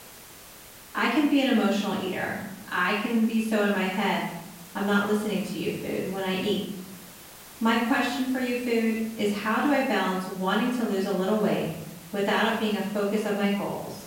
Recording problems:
off-mic speech; far
room echo; noticeable; dies away in 0.8 s
hiss; noticeable; throughout; 20 dB below the speech

